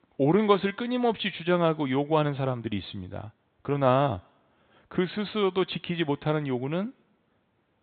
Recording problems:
high frequencies cut off; severe; nothing above 4 kHz

